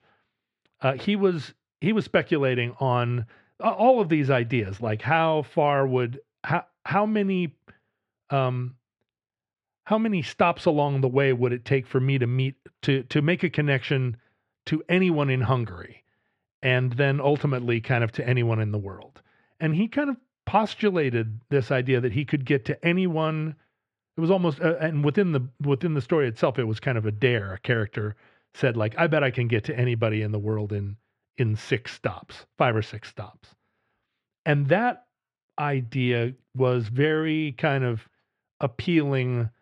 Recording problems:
muffled; slightly; fading above 2.5 kHz

